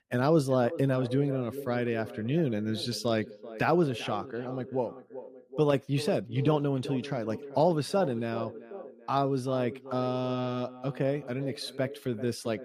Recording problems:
echo of what is said; noticeable; throughout; 390 ms later, 15 dB below the speech

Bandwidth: 15 kHz